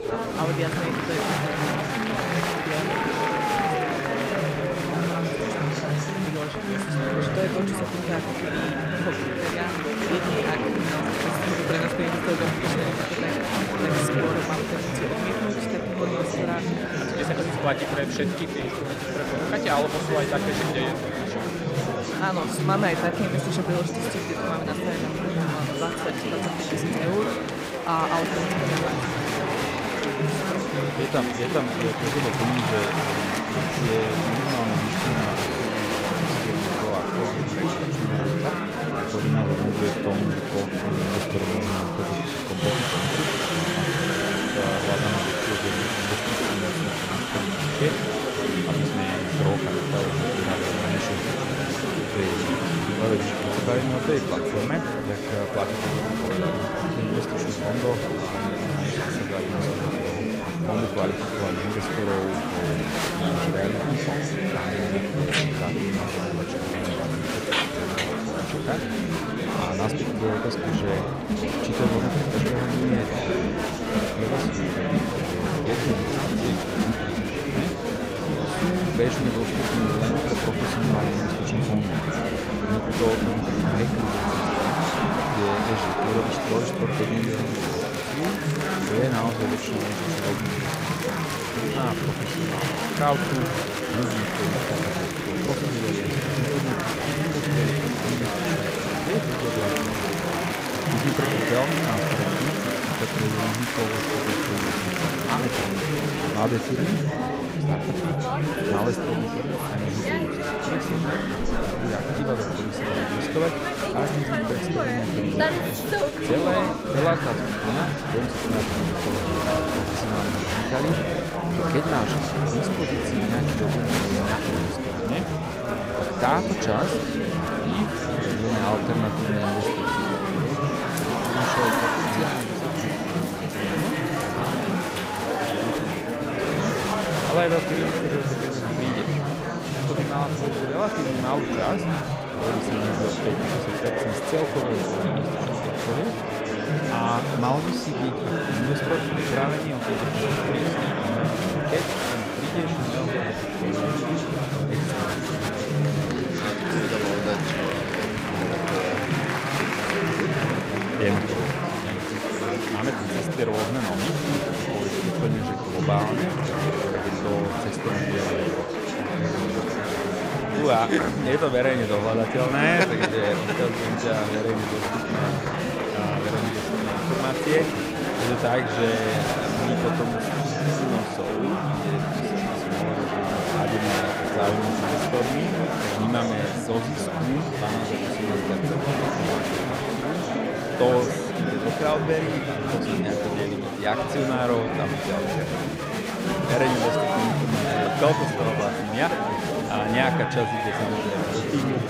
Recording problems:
murmuring crowd; very loud; throughout; 4 dB above the speech

